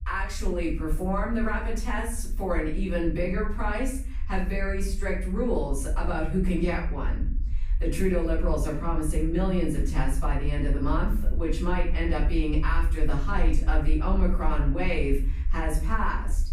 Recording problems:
off-mic speech; far
room echo; noticeable; dies away in 0.5 s
low rumble; faint; throughout; 25 dB below the speech

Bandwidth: 15.5 kHz